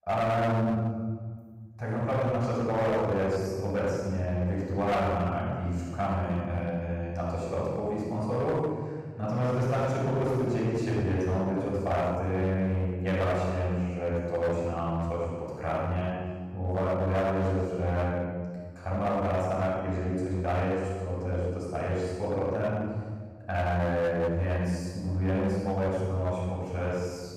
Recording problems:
room echo; strong; dies away in 1.6 s
off-mic speech; far
distortion; slight; 11% of the sound clipped

